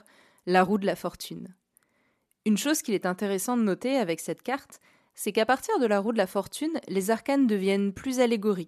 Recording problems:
none

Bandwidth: 13.5 kHz